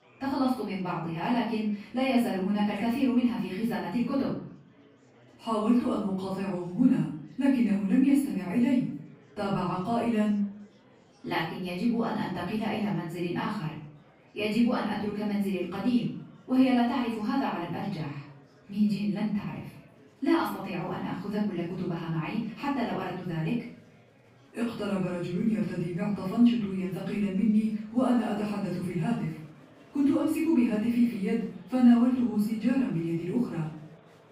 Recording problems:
off-mic speech; far
room echo; noticeable; dies away in 0.5 s
murmuring crowd; faint; throughout; 30 dB below the speech

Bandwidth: 15.5 kHz